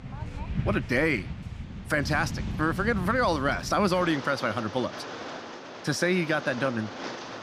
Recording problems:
rain or running water; loud; throughout; 10 dB below the speech

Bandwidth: 15.5 kHz